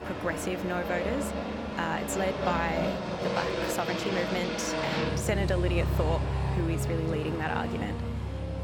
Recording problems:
train or aircraft noise; very loud; throughout; 1 dB above the speech
background music; loud; throughout; 10 dB below the speech

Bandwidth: 18.5 kHz